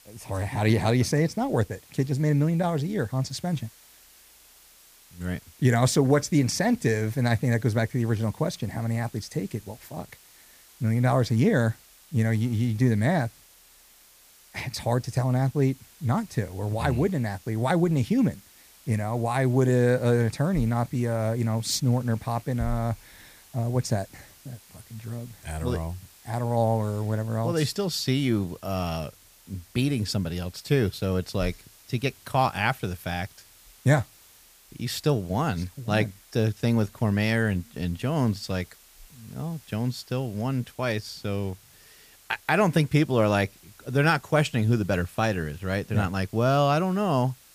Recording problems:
hiss; faint; throughout; 25 dB below the speech

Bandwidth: 15 kHz